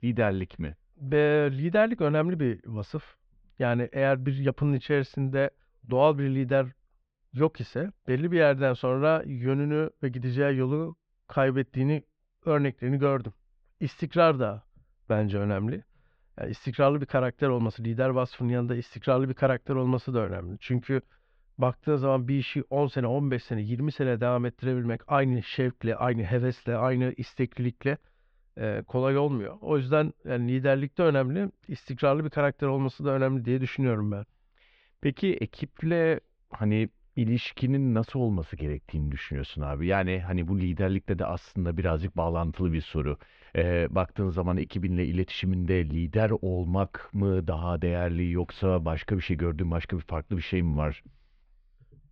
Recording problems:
muffled; slightly; fading above 3.5 kHz

